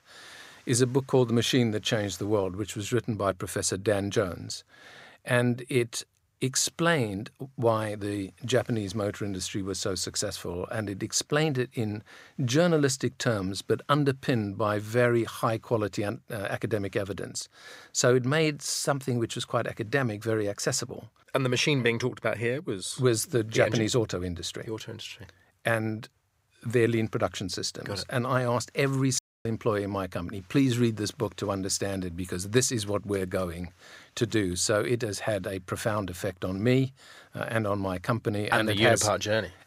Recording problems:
audio cutting out; at 29 s

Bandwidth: 15.5 kHz